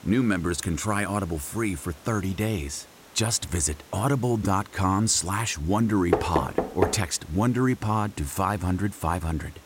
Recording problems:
hiss; faint; throughout; 25 dB below the speech
door banging; loud; at 6 s; peak level with the speech

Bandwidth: 16 kHz